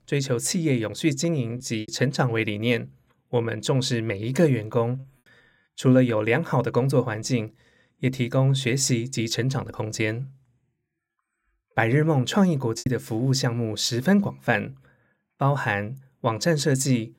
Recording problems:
choppy; occasionally; at 1.5 s, at 5 s and at 13 s; 3% of the speech affected

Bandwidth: 16 kHz